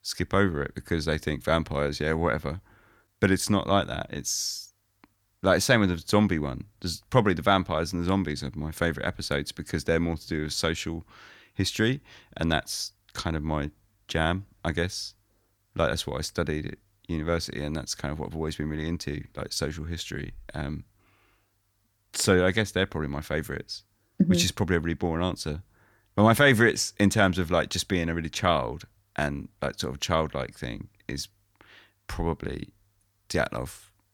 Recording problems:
none

